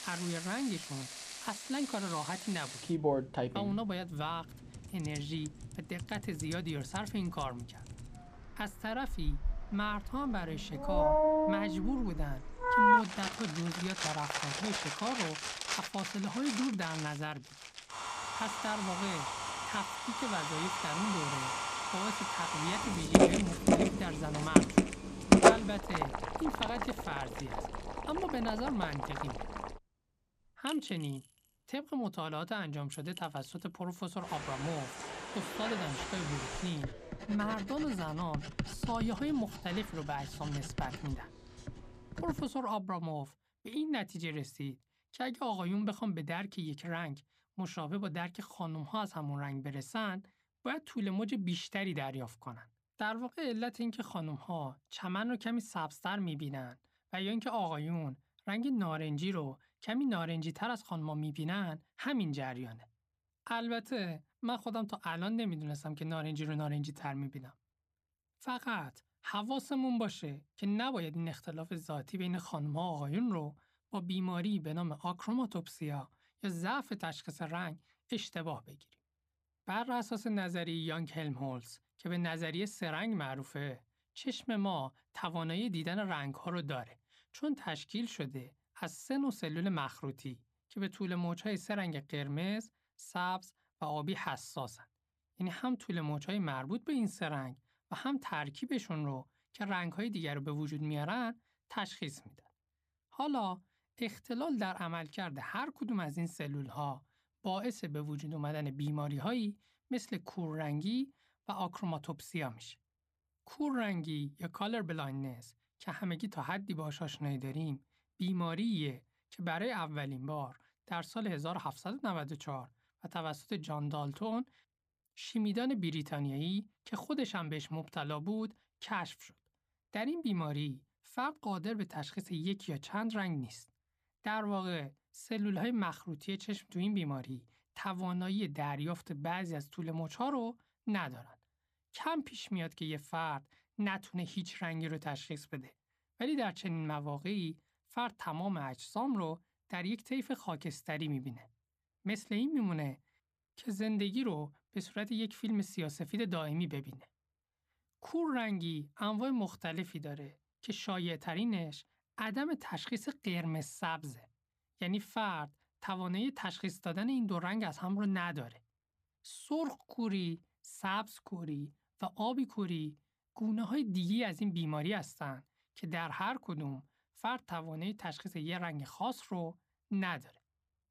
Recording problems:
household noises; very loud; until 43 s; 4 dB above the speech

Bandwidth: 15 kHz